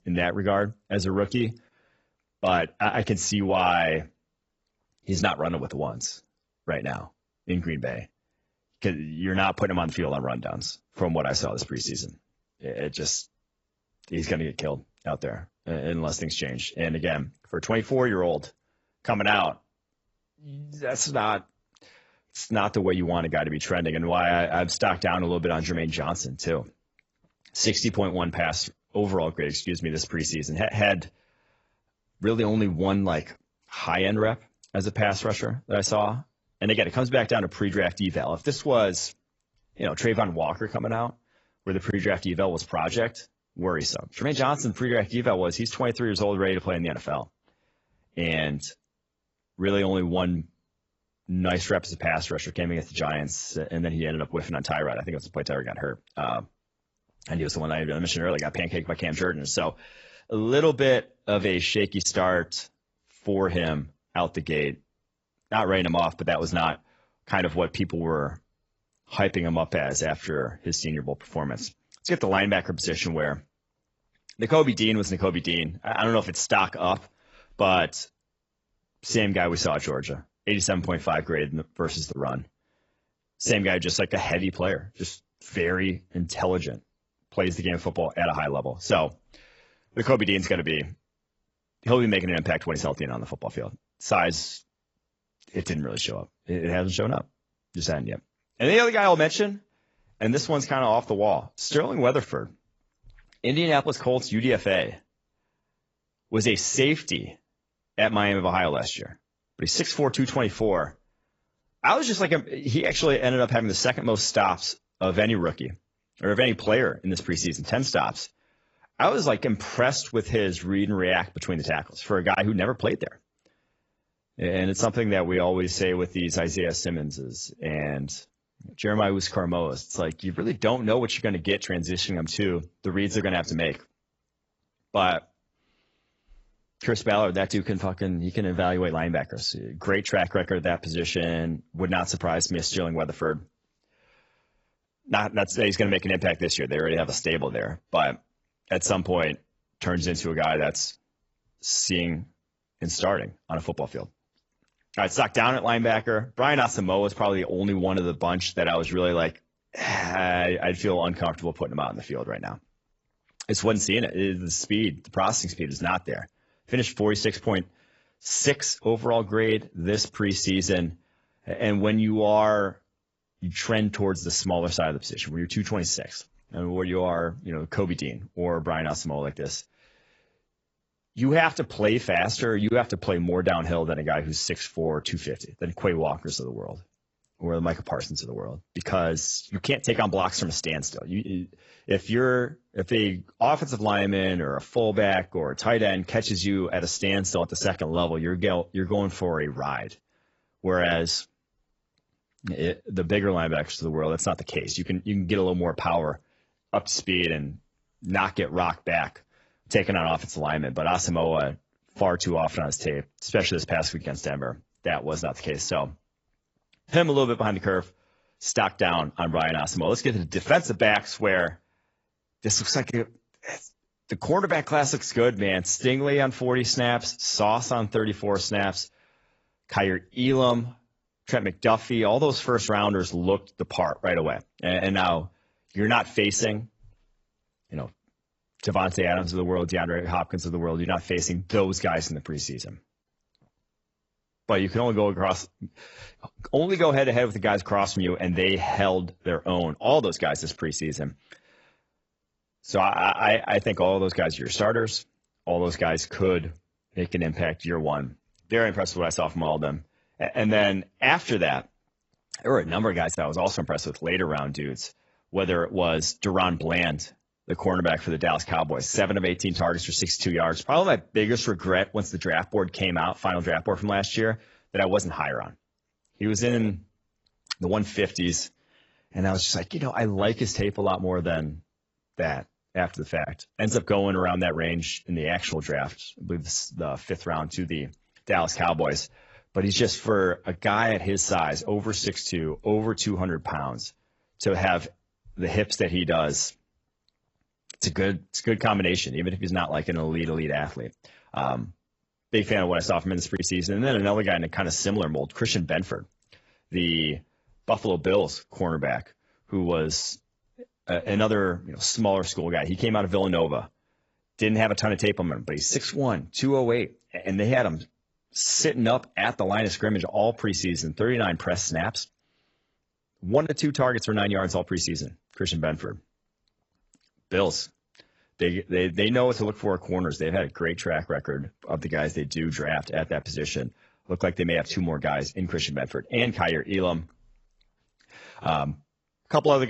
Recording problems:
garbled, watery; badly; nothing above 7.5 kHz
abrupt cut into speech; at the end

